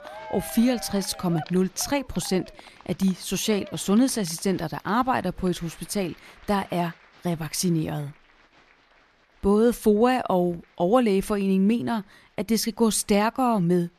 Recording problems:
crowd noise; faint; throughout; 20 dB below the speech

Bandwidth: 13.5 kHz